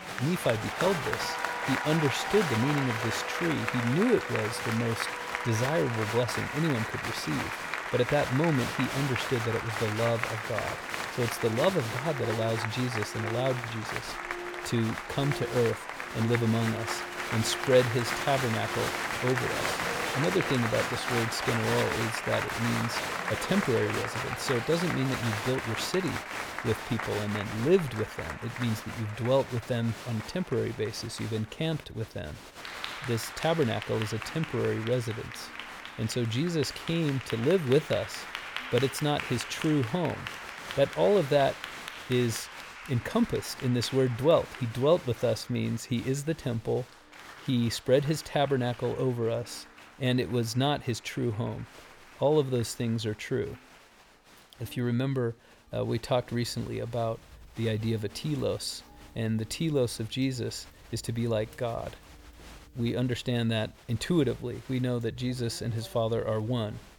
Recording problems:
crowd noise; loud; throughout; 5 dB below the speech
background music; noticeable; throughout; 15 dB below the speech

